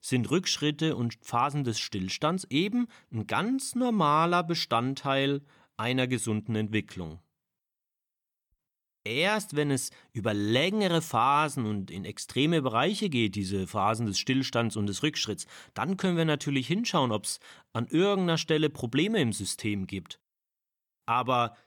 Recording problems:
none

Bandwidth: 18.5 kHz